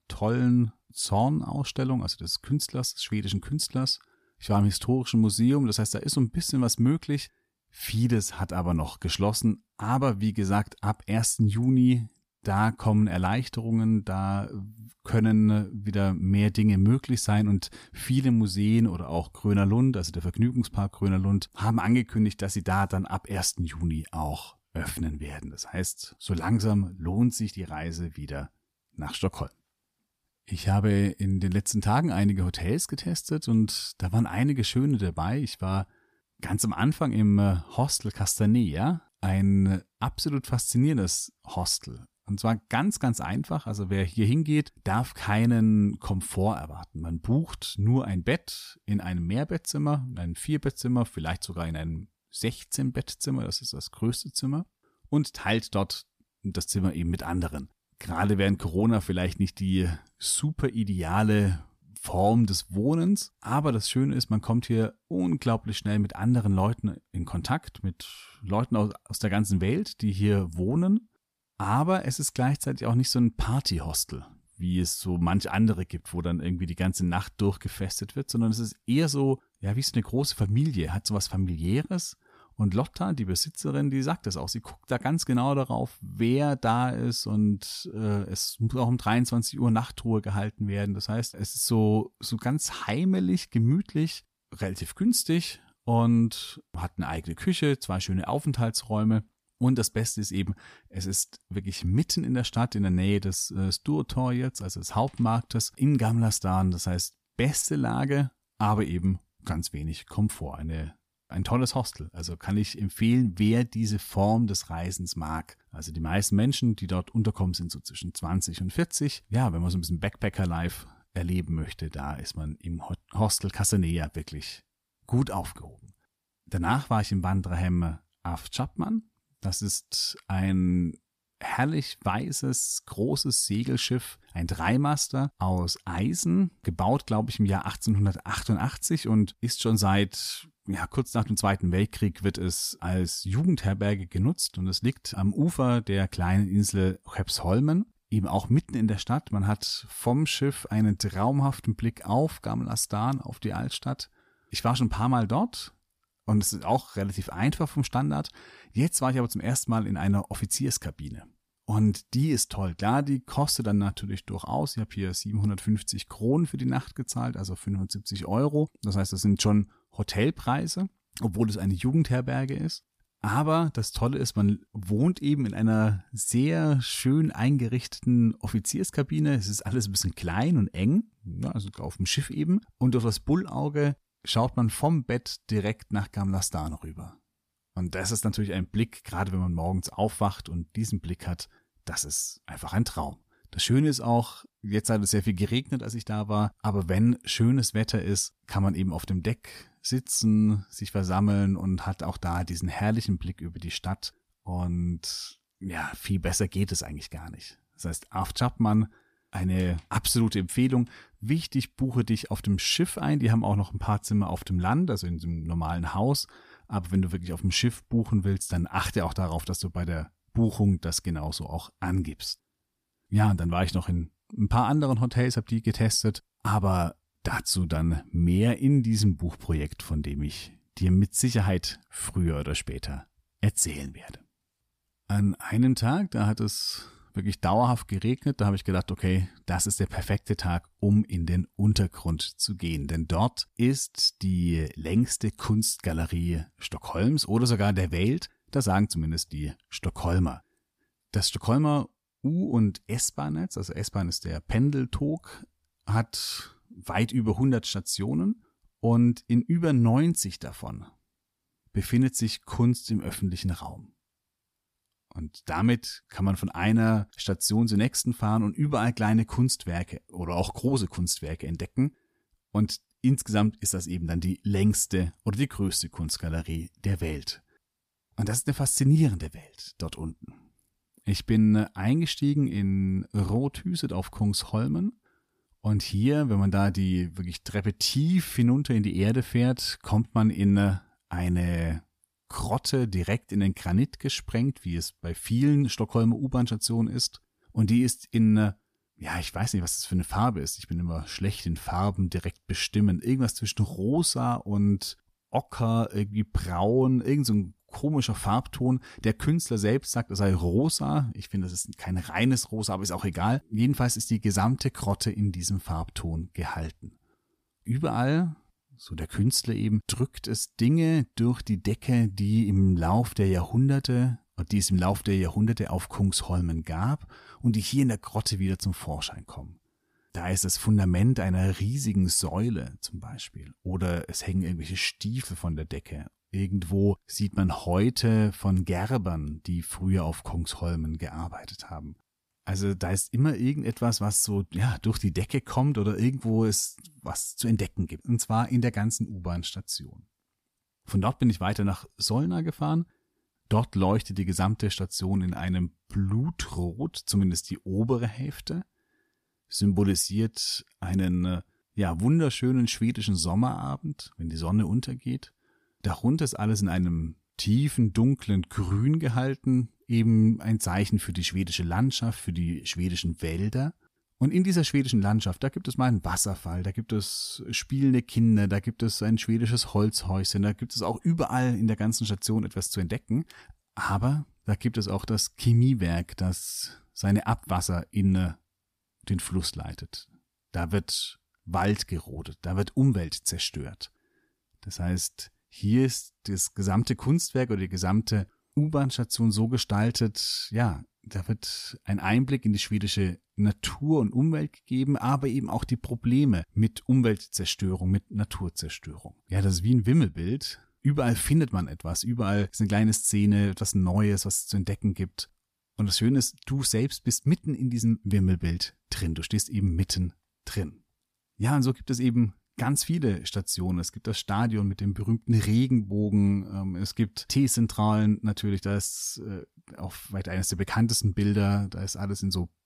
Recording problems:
none

